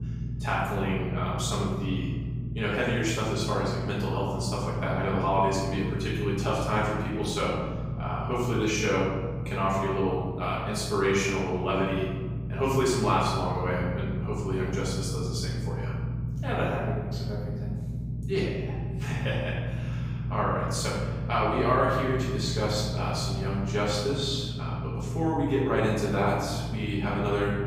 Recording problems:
off-mic speech; far
room echo; noticeable; dies away in 1.1 s
low rumble; noticeable; throughout; 15 dB below the speech

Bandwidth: 15.5 kHz